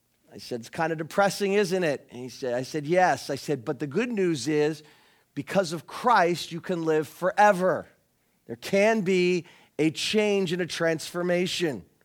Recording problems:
none

